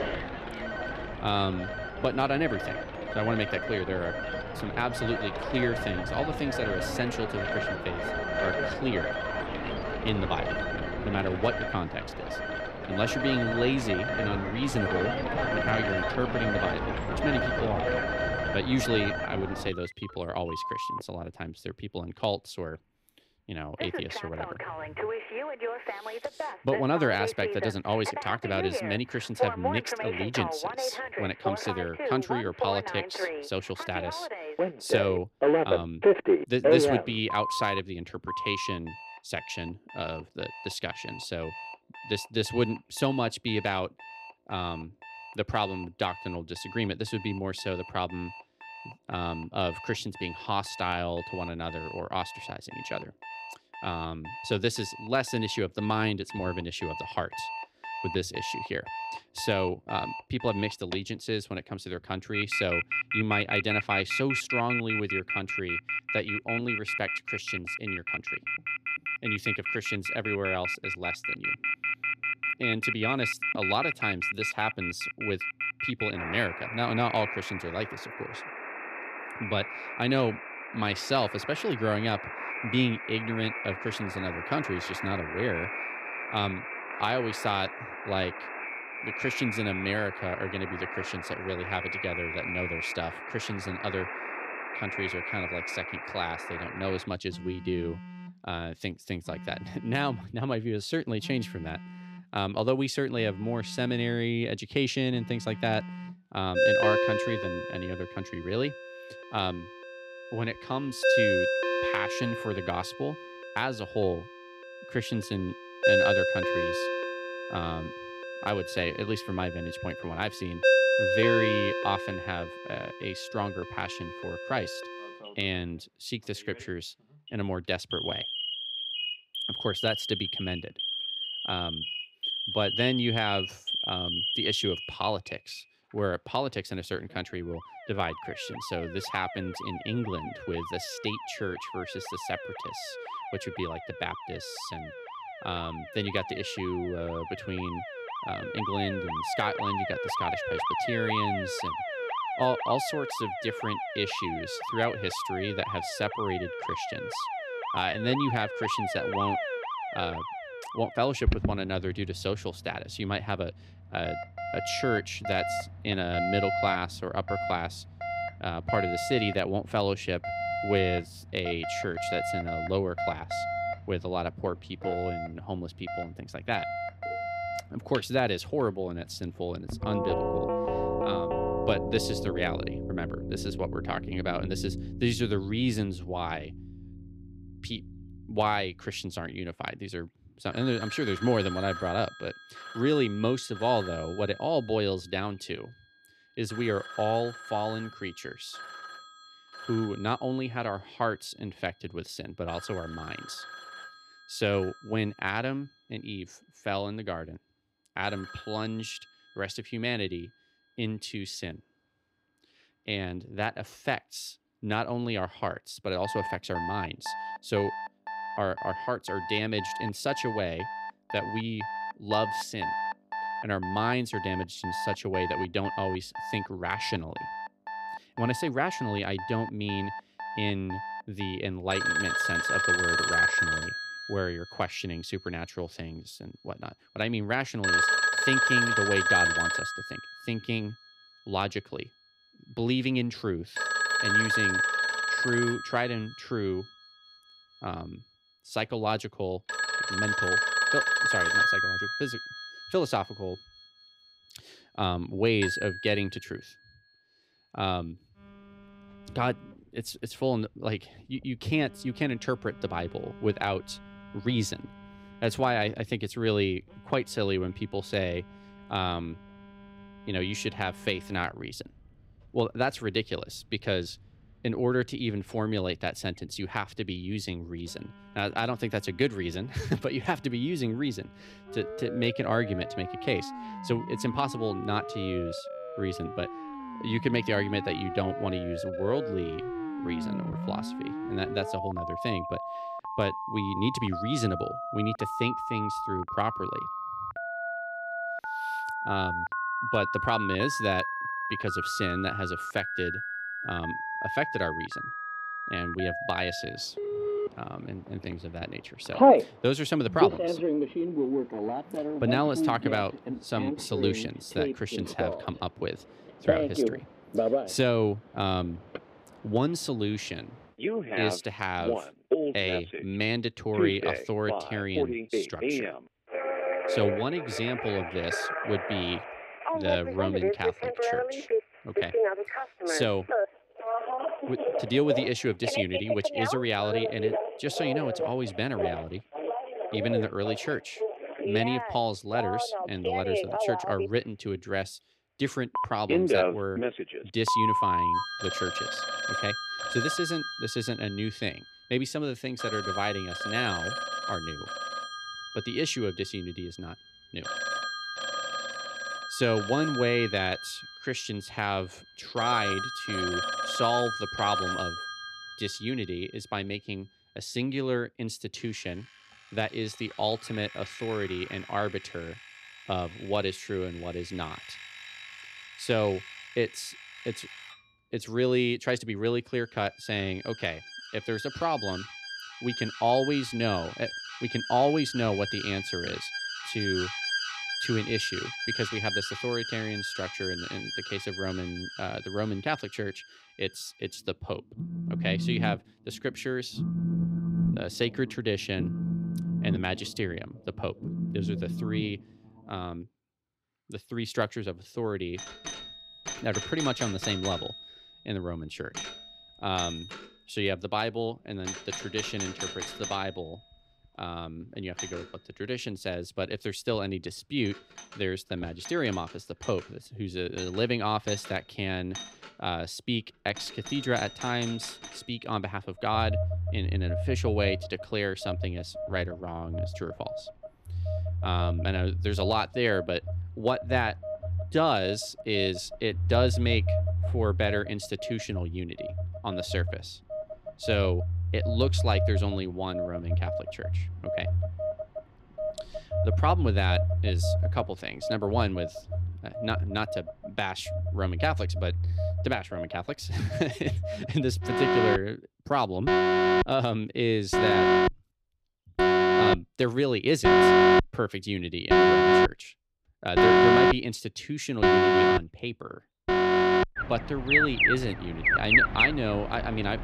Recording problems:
alarms or sirens; very loud; throughout; 1 dB above the speech

